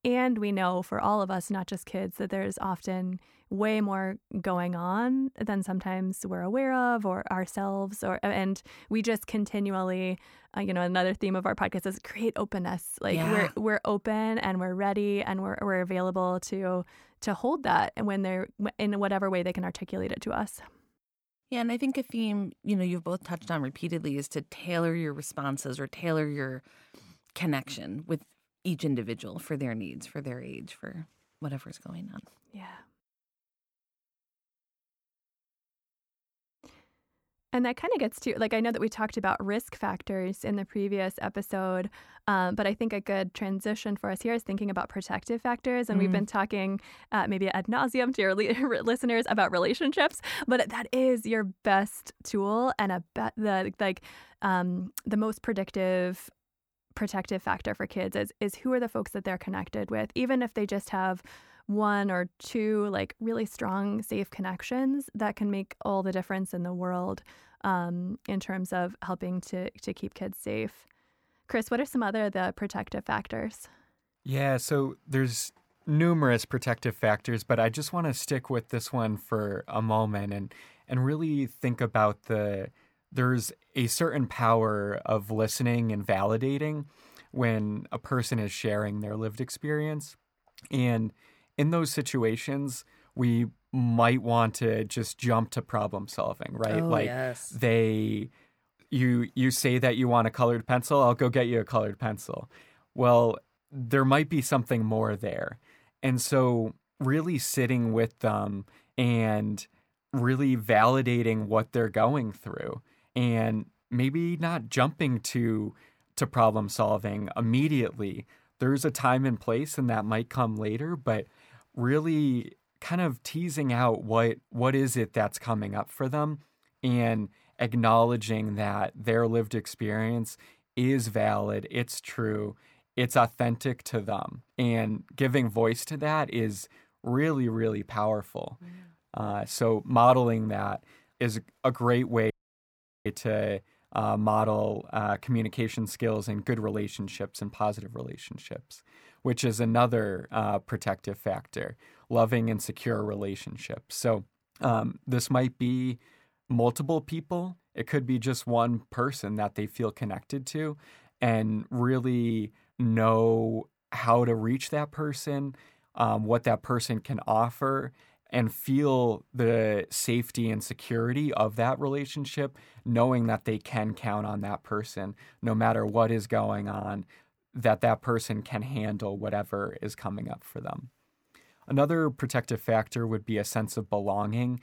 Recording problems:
audio cutting out; at 2:22 for 1 s

